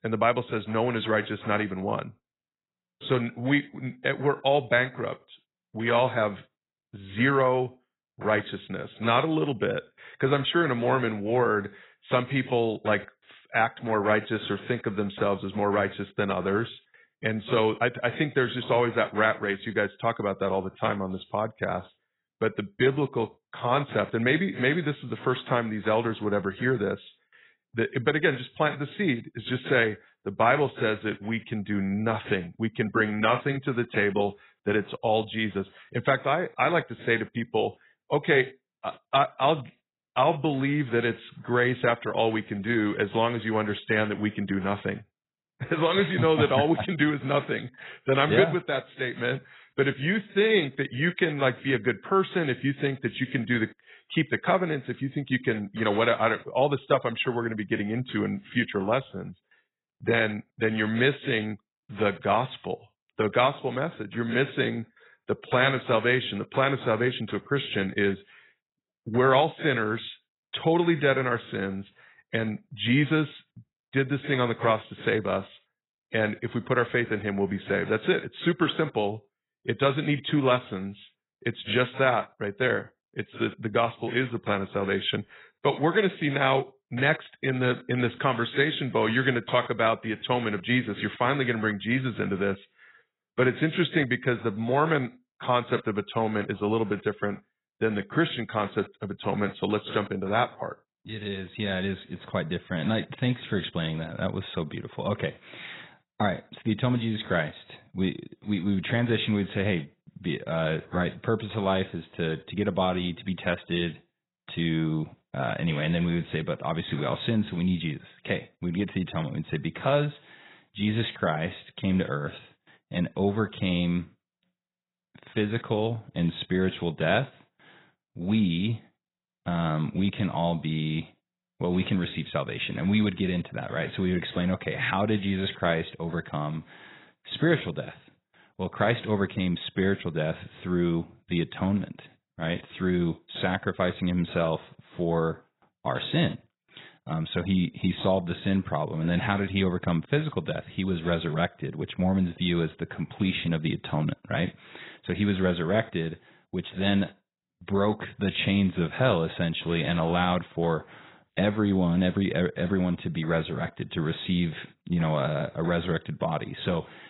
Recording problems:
garbled, watery; badly; nothing above 4 kHz

